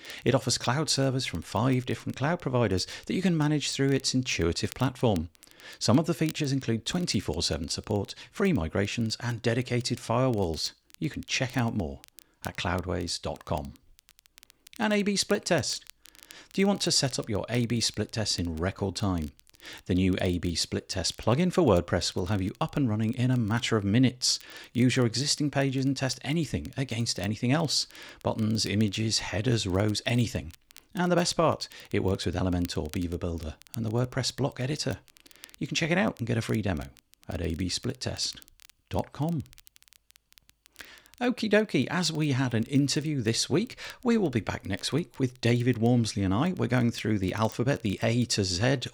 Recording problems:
crackle, like an old record; faint; 25 dB below the speech

